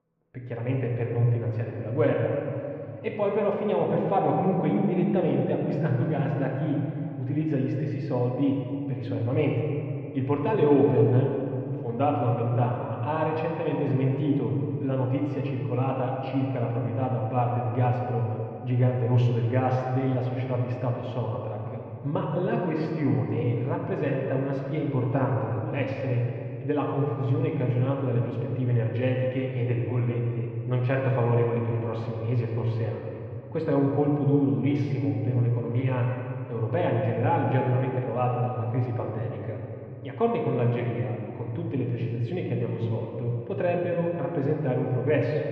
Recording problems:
muffled; very; fading above 2.5 kHz
room echo; noticeable; dies away in 2.6 s
off-mic speech; somewhat distant

